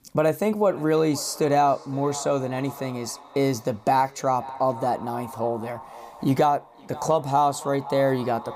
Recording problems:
echo of what is said; noticeable; throughout; 520 ms later, 15 dB below the speech

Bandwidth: 15 kHz